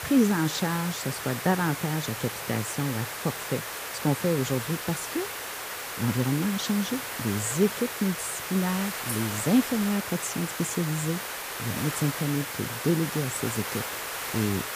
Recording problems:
hiss; loud; throughout; 4 dB below the speech
jangling keys; noticeable; at 9 s; peak 8 dB below the speech

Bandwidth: 15 kHz